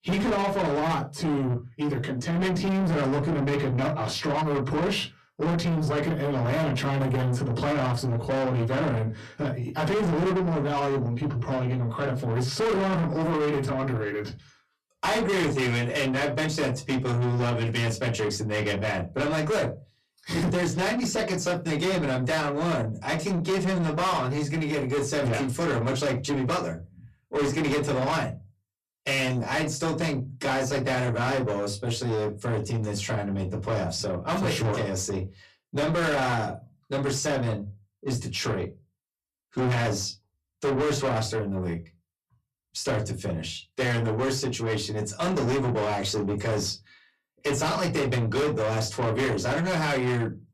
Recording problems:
distortion; heavy; 6 dB below the speech
off-mic speech; far
room echo; very slight; dies away in 0.2 s

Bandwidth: 13.5 kHz